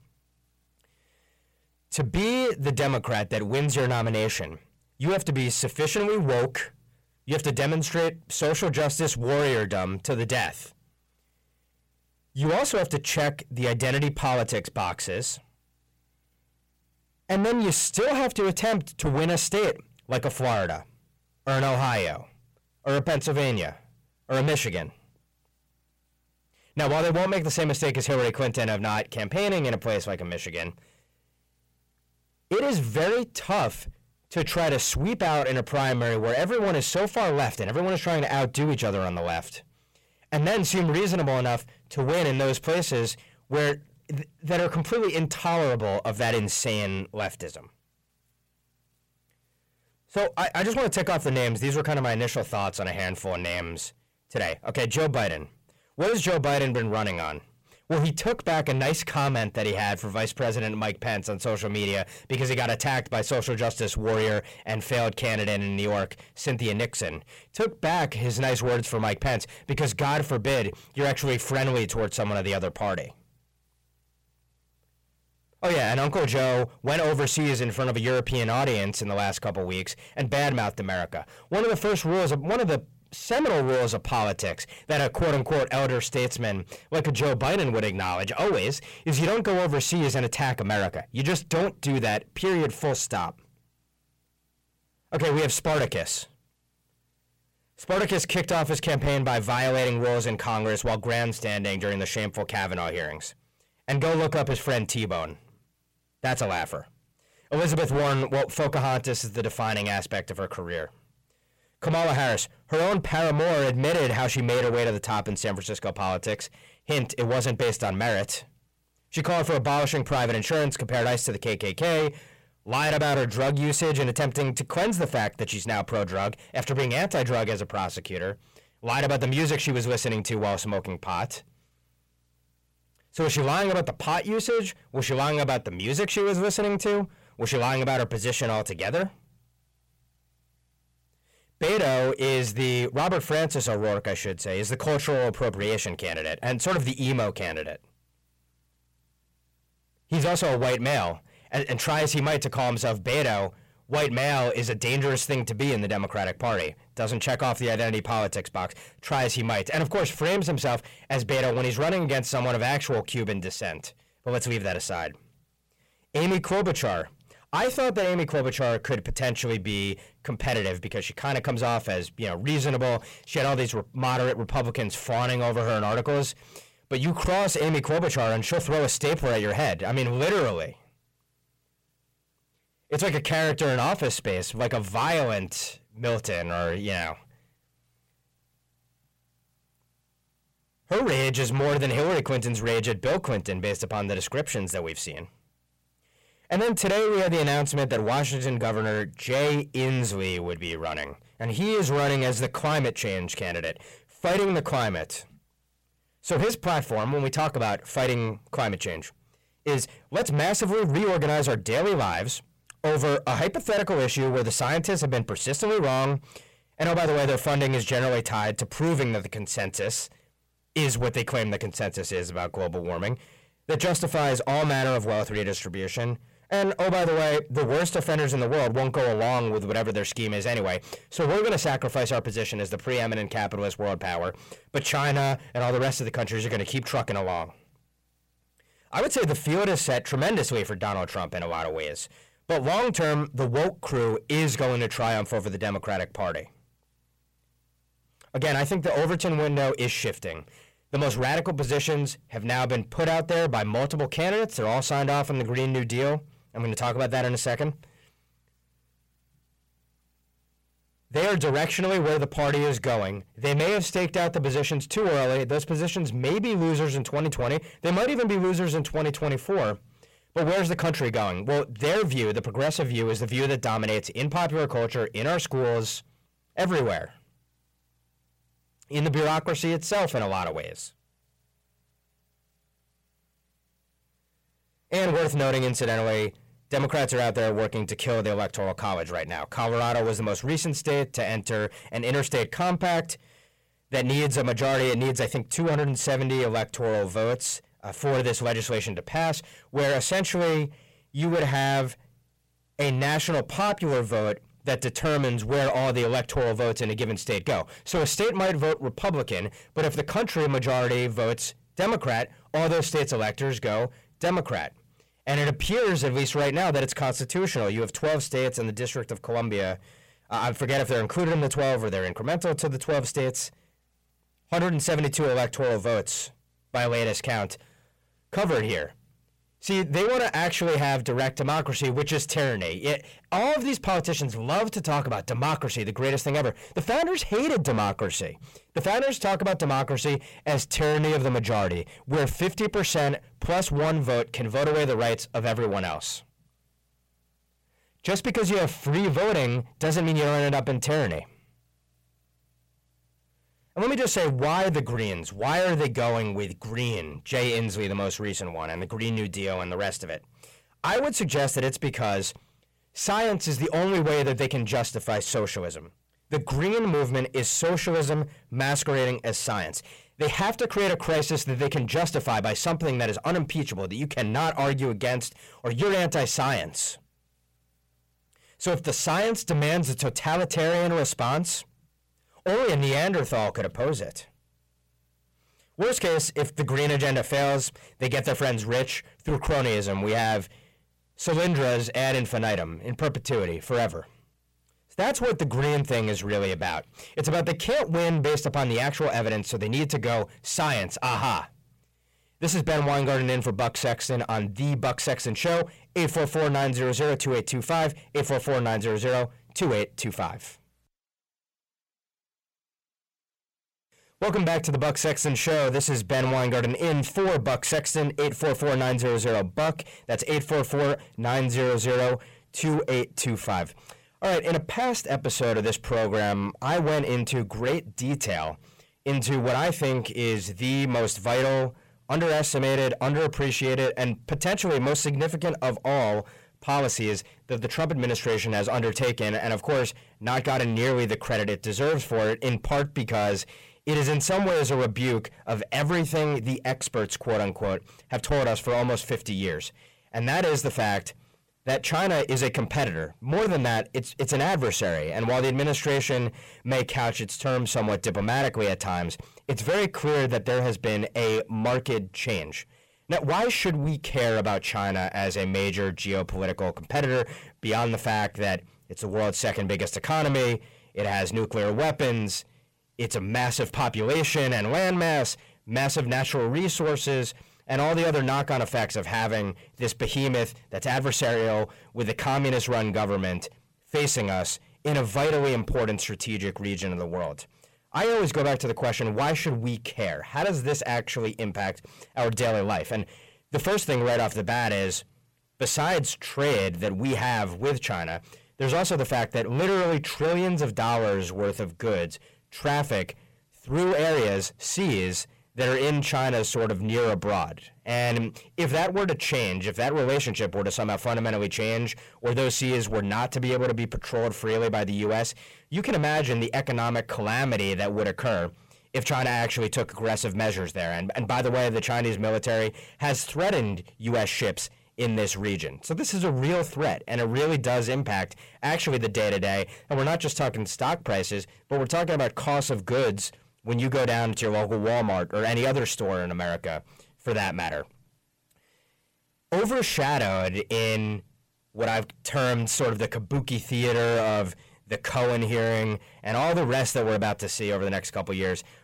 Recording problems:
distortion; heavy; 6 dB below the speech

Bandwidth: 16 kHz